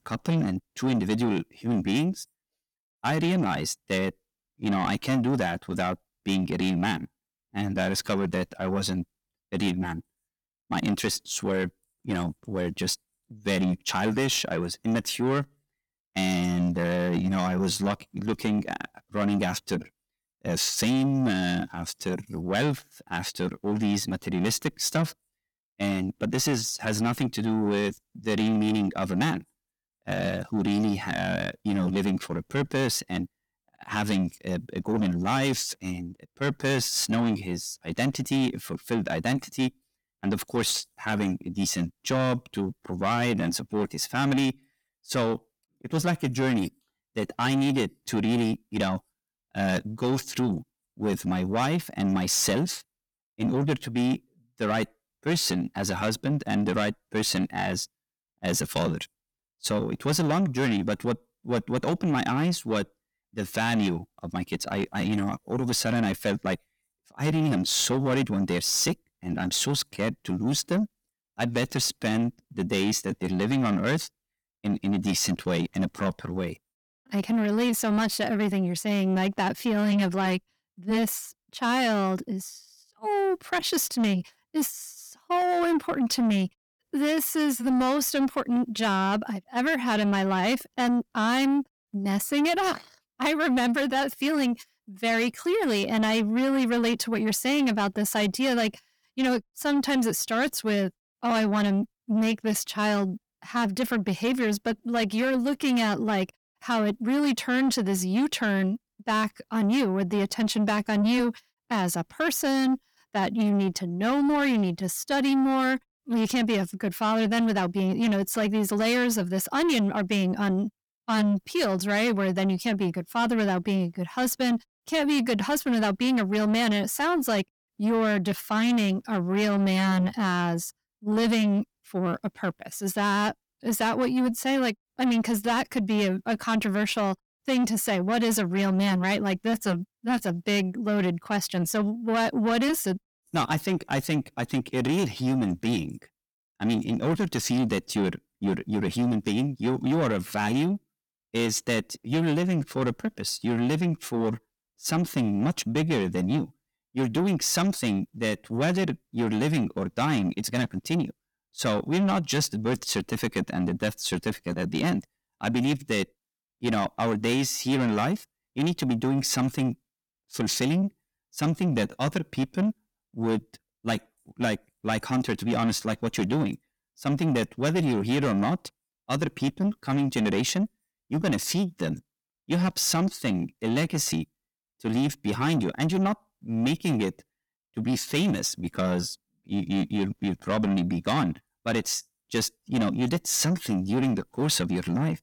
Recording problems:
distortion; slight; 10 dB below the speech

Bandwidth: 18.5 kHz